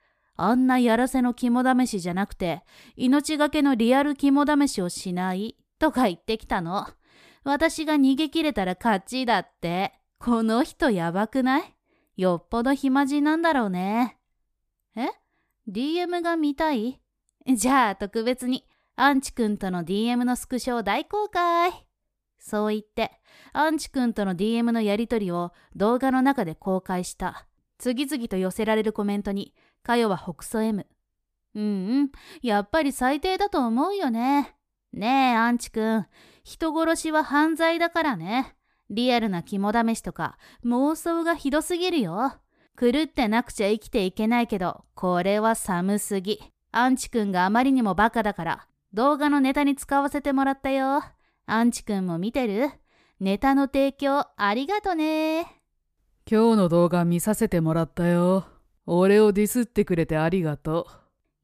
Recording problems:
none

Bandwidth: 14.5 kHz